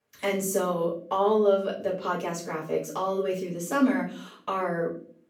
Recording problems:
off-mic speech; far
room echo; slight; dies away in 0.4 s

